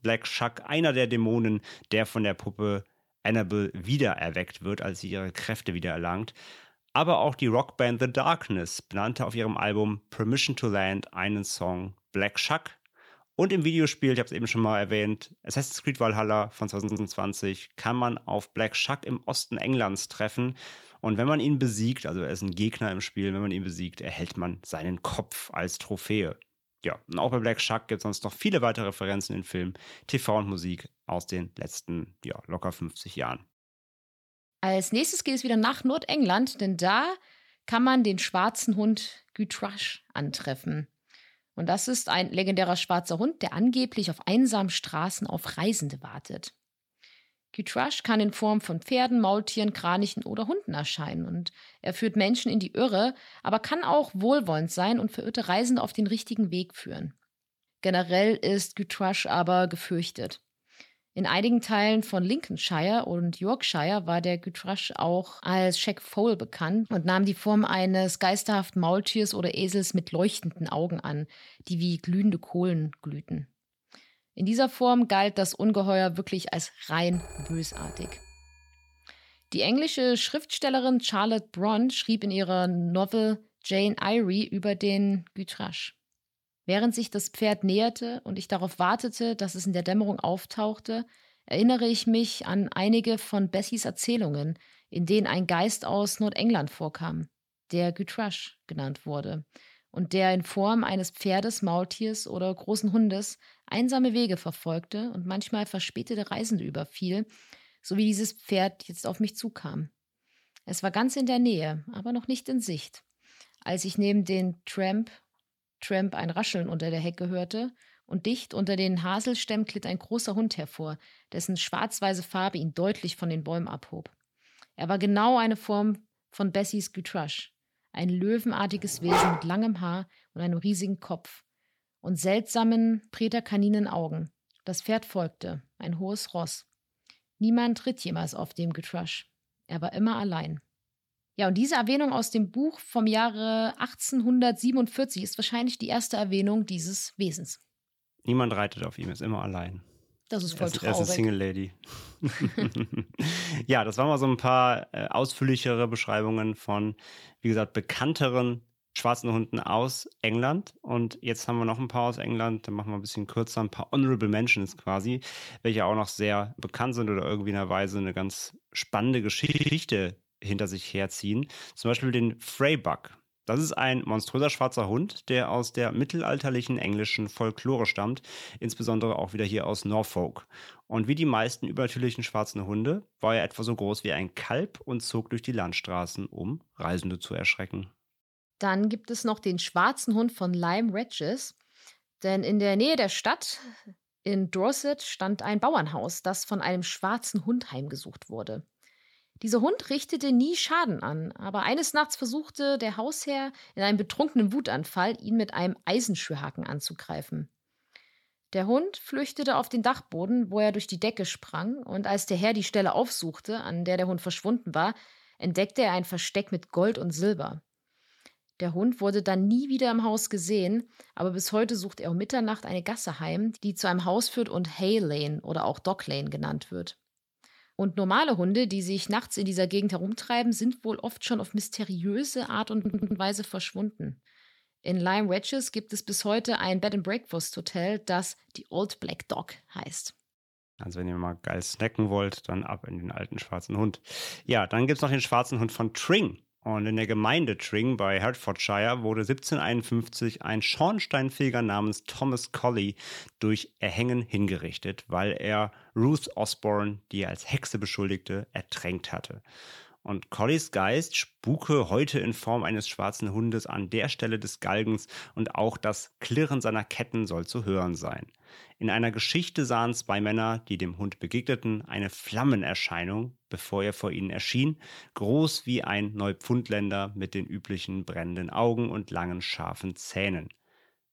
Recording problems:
audio stuttering; at 17 s, at 2:49 and at 3:53
phone ringing; faint; from 1:17 to 1:19; peak 15 dB below the speech
dog barking; loud; at 2:09; peak 4 dB above the speech

